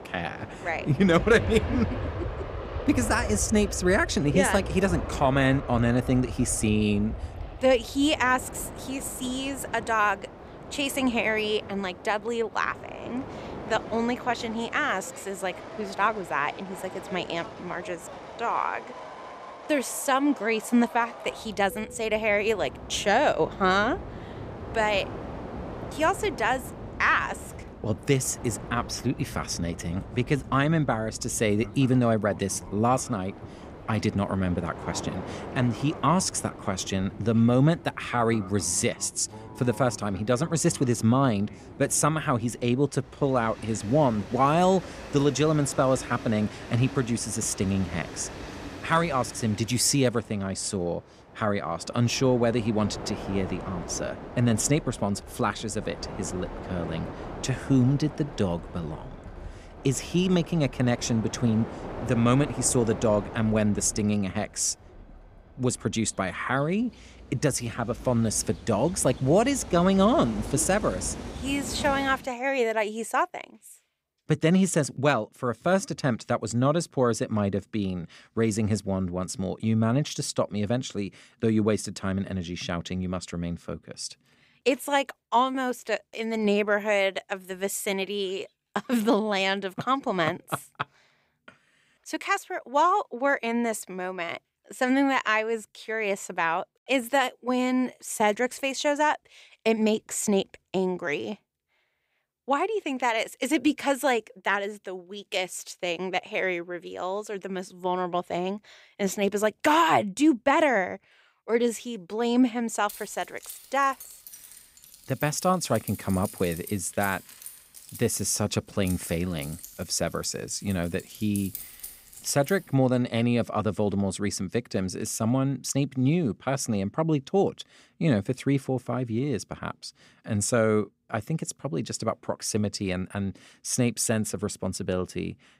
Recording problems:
train or aircraft noise; noticeable; until 1:12; 15 dB below the speech
jangling keys; noticeable; from 1:53 to 2:03; peak 10 dB below the speech

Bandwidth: 15.5 kHz